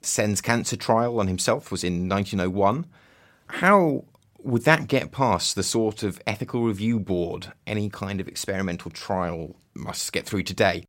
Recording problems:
none

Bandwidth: 16 kHz